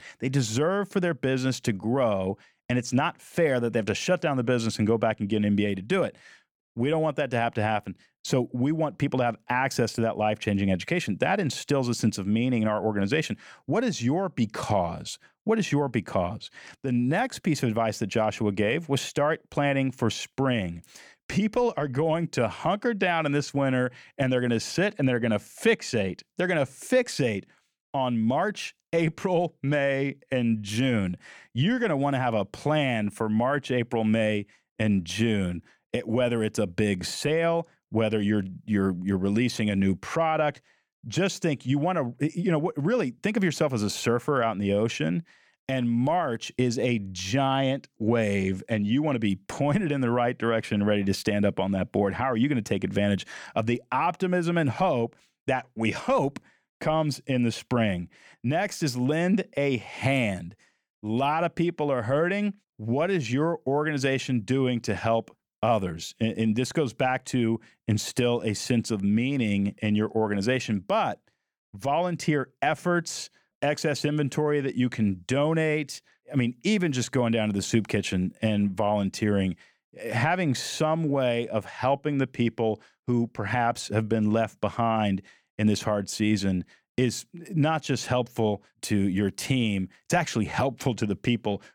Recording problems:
none

